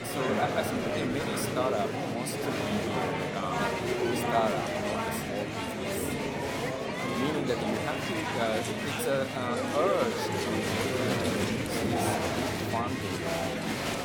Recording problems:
murmuring crowd; very loud; throughout; 3 dB above the speech
alarm; noticeable; from 6 to 8.5 s; peak 9 dB below the speech

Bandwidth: 17.5 kHz